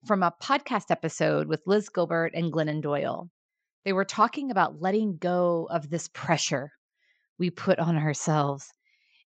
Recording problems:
high frequencies cut off; noticeable; nothing above 8 kHz

